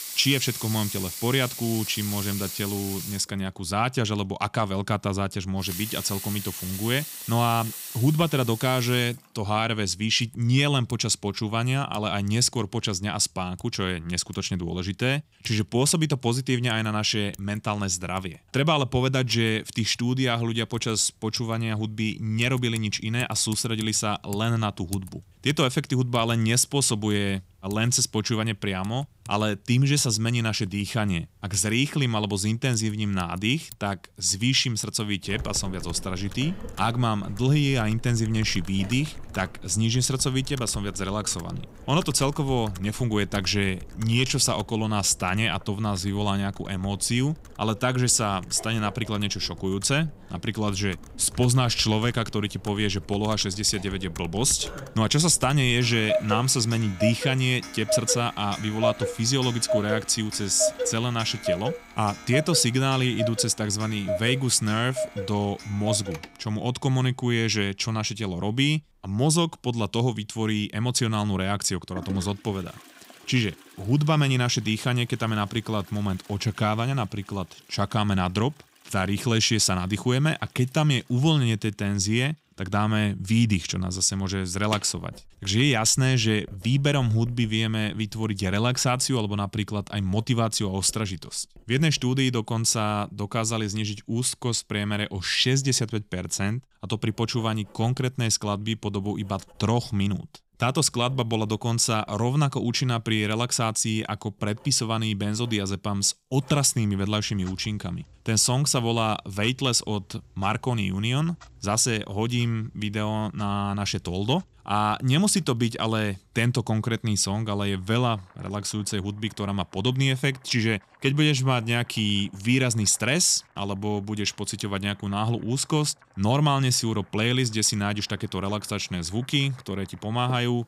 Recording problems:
household noises; noticeable; throughout; 10 dB below the speech

